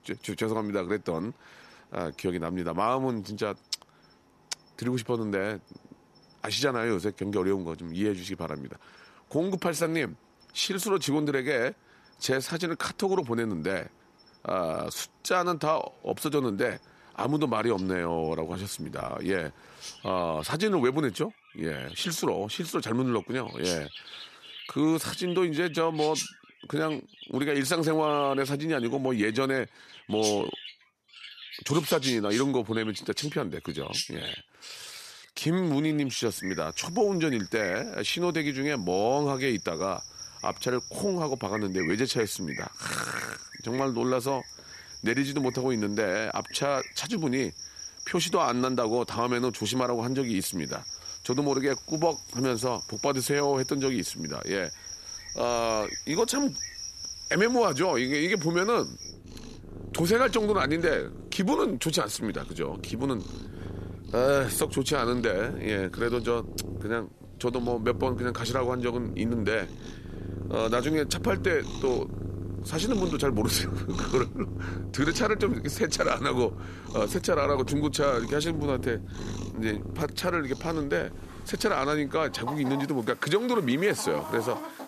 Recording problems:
animal sounds; loud; throughout; 10 dB below the speech

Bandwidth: 14 kHz